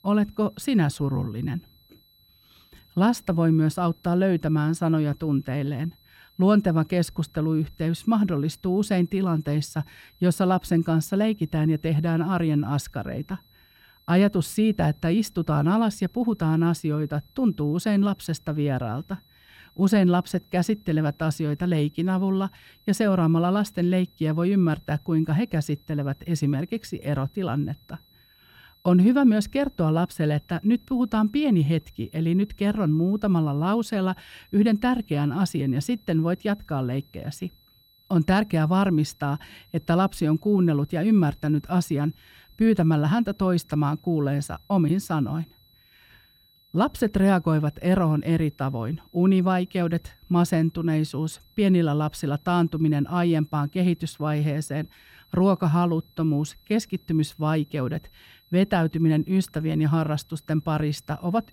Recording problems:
high-pitched whine; faint; throughout; 4 kHz, 35 dB below the speech

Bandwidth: 16.5 kHz